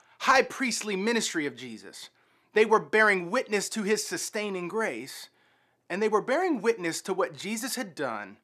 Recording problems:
none

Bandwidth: 14.5 kHz